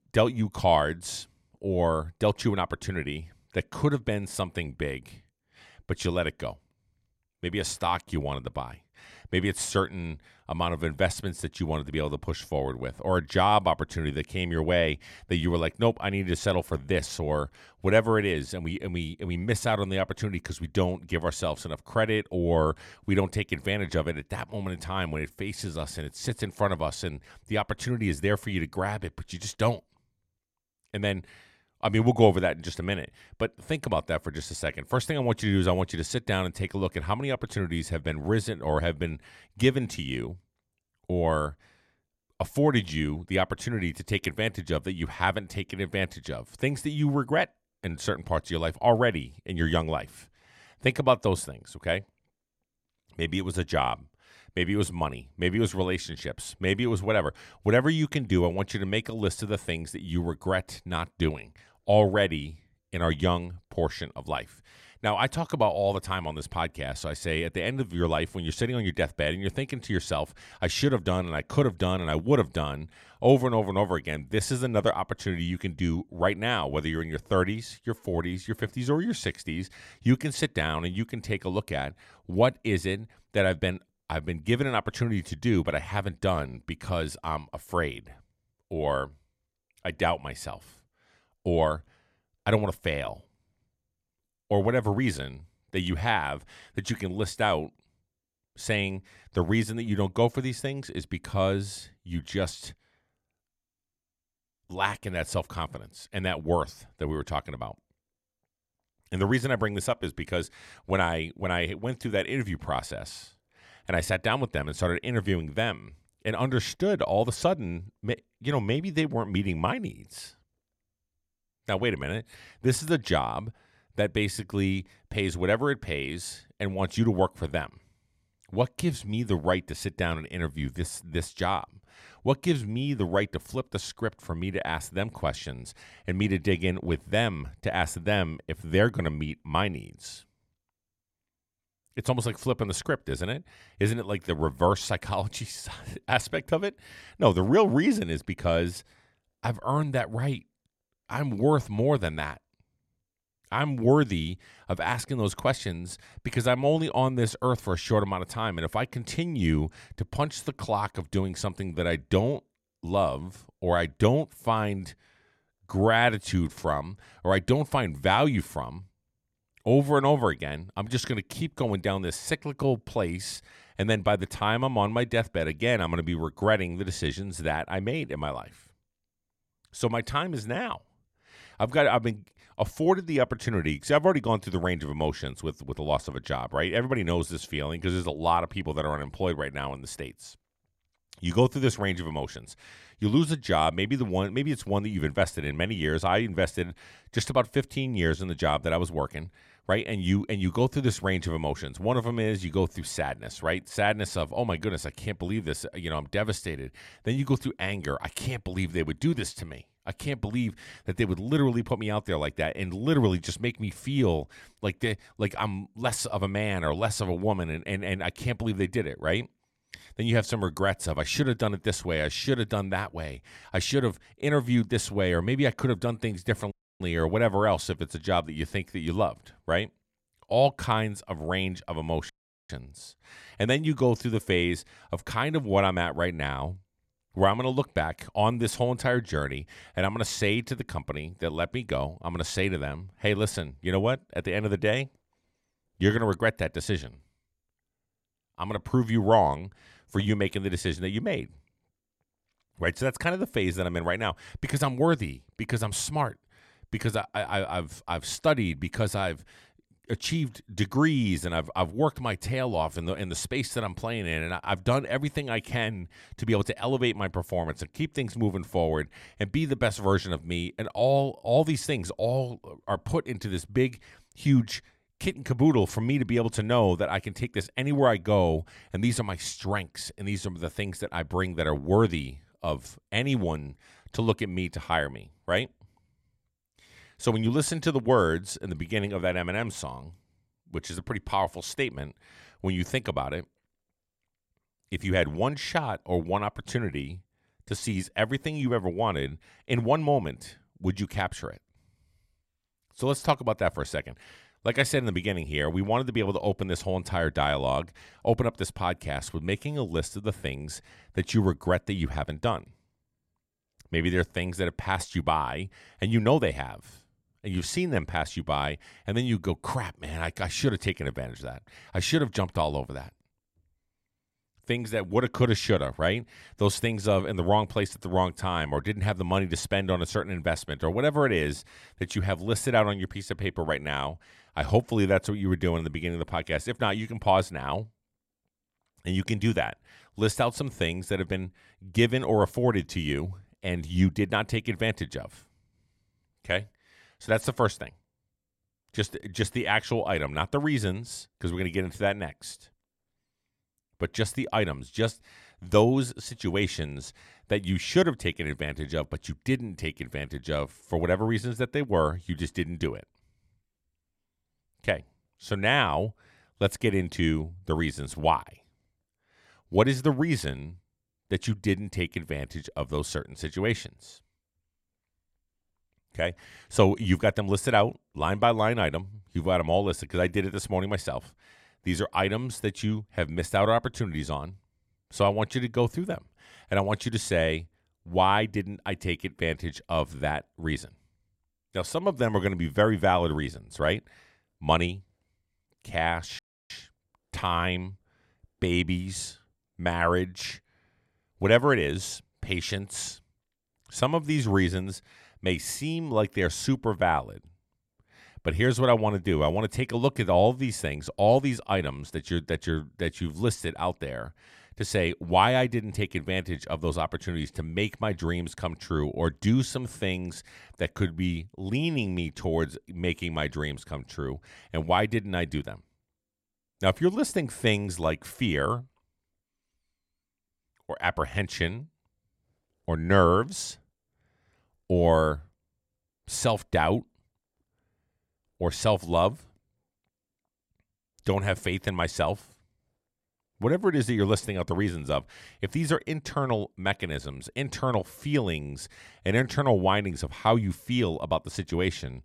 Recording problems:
audio cutting out; at 3:47, at 3:52 and at 6:36

